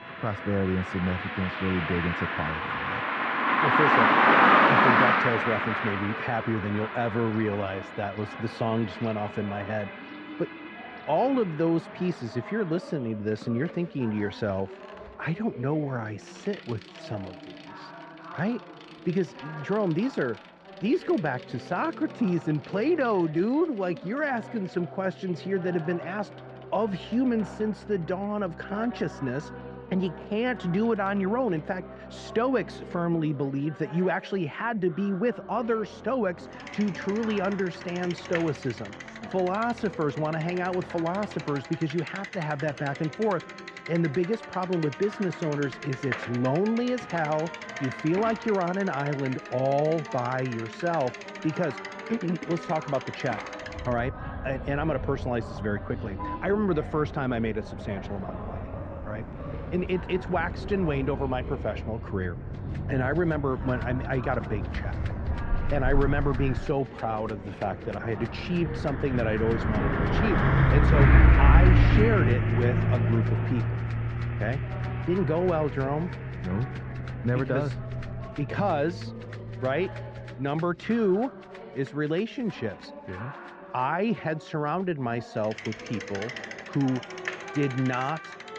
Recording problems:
muffled; very; fading above 2 kHz
traffic noise; very loud; throughout; 1 dB above the speech
background music; noticeable; throughout; 20 dB below the speech
chatter from many people; noticeable; throughout; 15 dB below the speech

